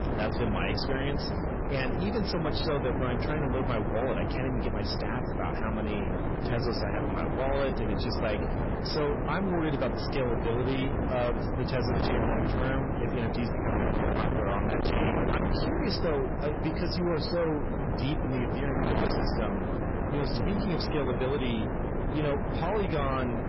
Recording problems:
distortion; heavy; 7 dB below the speech
garbled, watery; badly; nothing above 5.5 kHz
wind noise on the microphone; heavy; 1 dB below the speech

